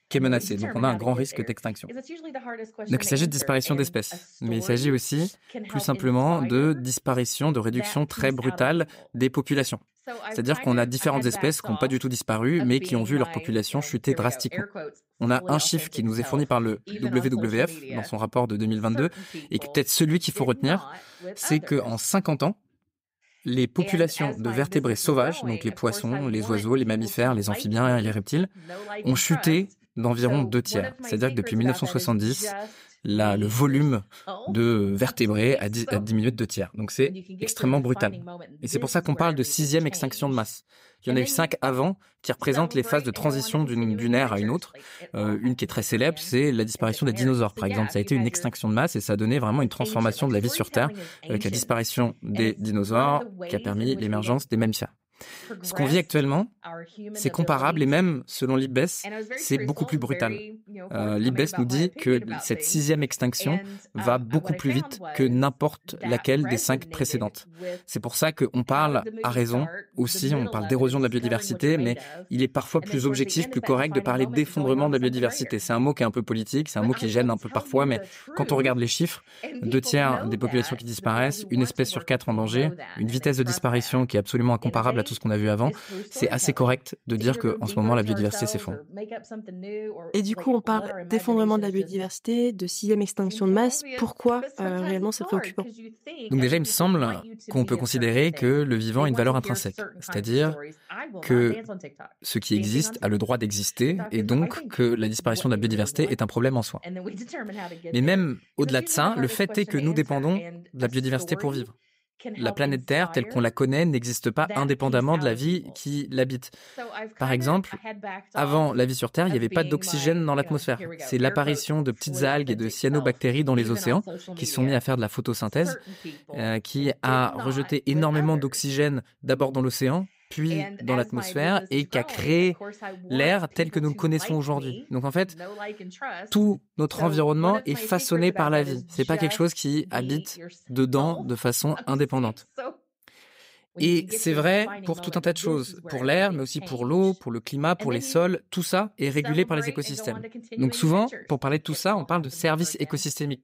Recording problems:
voice in the background; noticeable; throughout; 15 dB below the speech

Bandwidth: 15.5 kHz